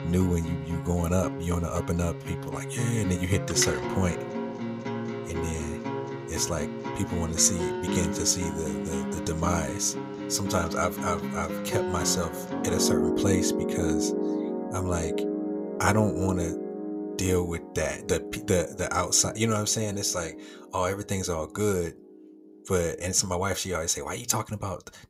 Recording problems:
background music; loud; throughout; 4 dB below the speech

